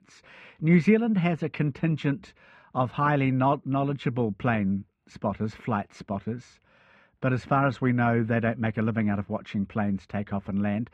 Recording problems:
muffled; very; fading above 2 kHz

